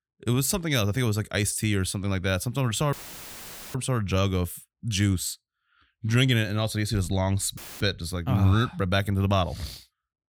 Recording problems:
audio cutting out; filled with static; at 3 s for 1 s and at 7.5 s

